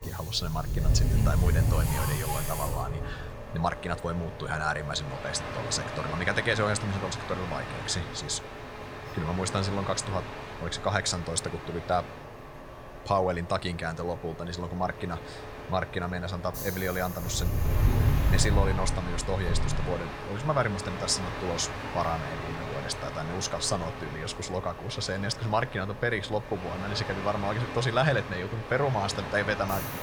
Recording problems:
train or aircraft noise; loud; throughout; 3 dB below the speech

